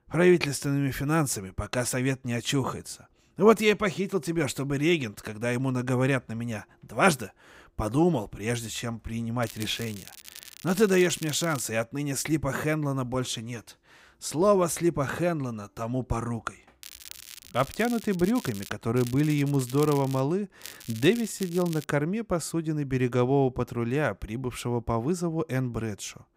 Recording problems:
crackling; noticeable; 4 times, first at 9.5 s; 15 dB below the speech

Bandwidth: 15.5 kHz